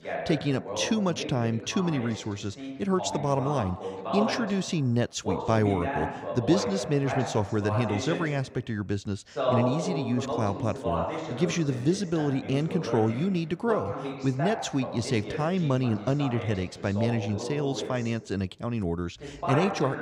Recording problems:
voice in the background; loud; throughout; 5 dB below the speech

